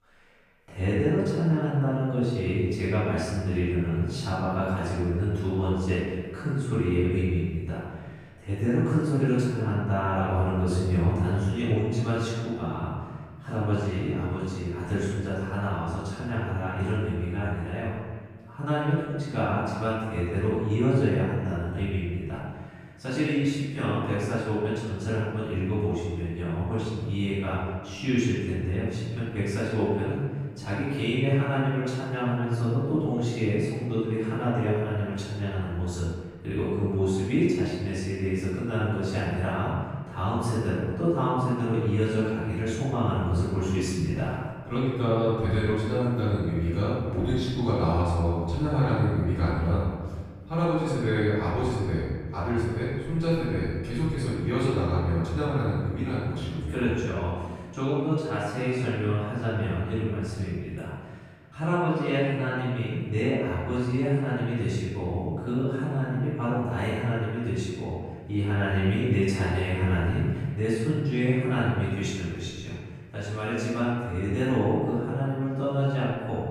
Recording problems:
room echo; strong; dies away in 1.5 s
off-mic speech; far

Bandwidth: 14.5 kHz